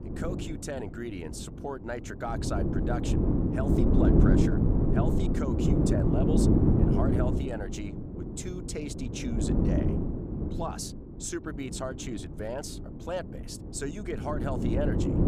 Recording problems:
wind noise on the microphone; heavy; 4 dB above the speech

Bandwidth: 15.5 kHz